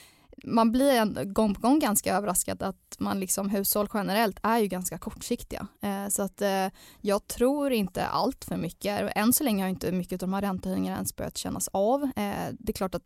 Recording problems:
none

